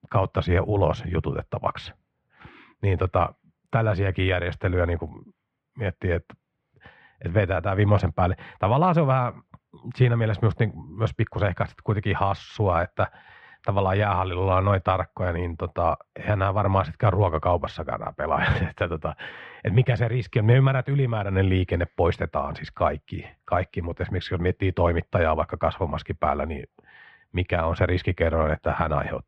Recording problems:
muffled; very; fading above 2.5 kHz

